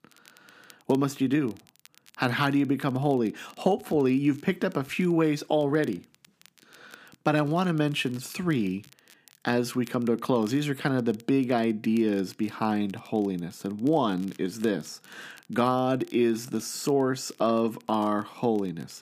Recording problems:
crackle, like an old record; faint; 30 dB below the speech

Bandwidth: 15 kHz